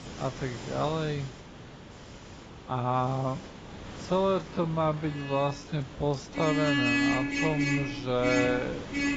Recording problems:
garbled, watery; badly; nothing above 8 kHz
wrong speed, natural pitch; too slow; 0.5 times normal speed
traffic noise; very loud; throughout; 1 dB above the speech
hiss; noticeable; throughout; 15 dB below the speech

